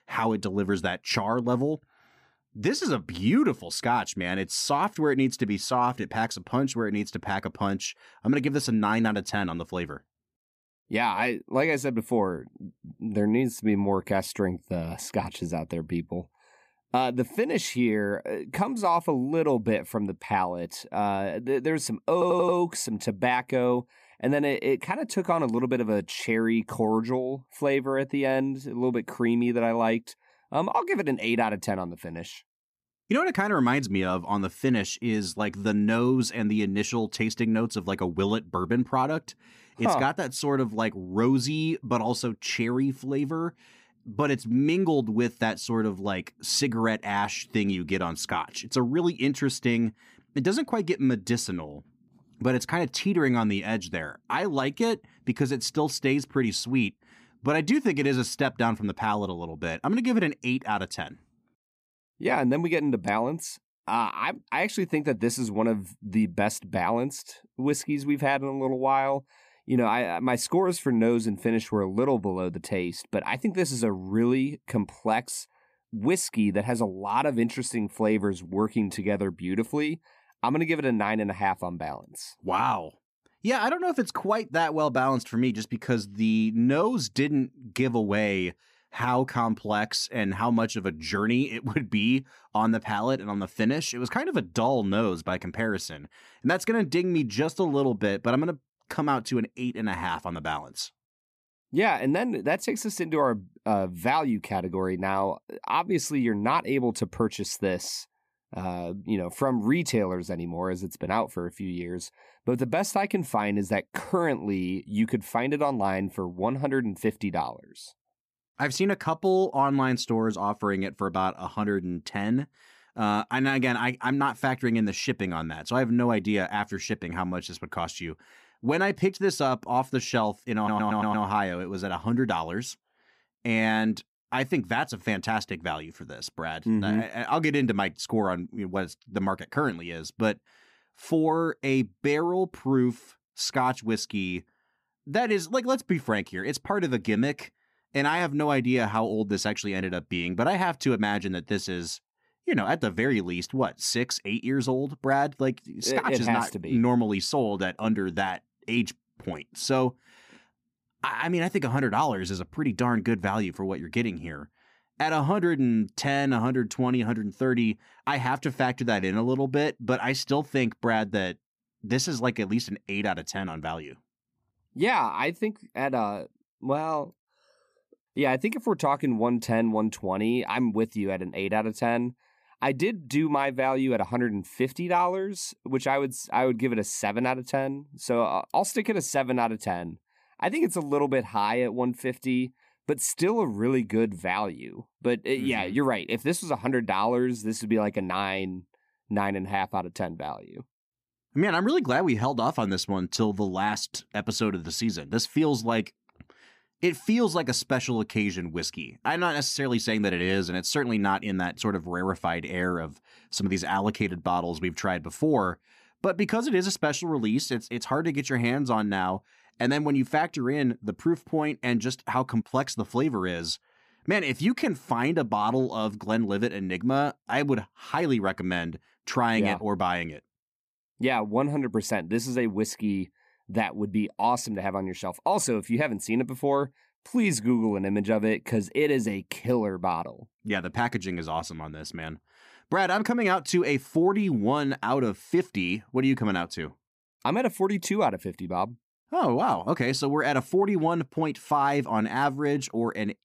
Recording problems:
audio stuttering; at 22 s and at 2:11

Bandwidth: 14.5 kHz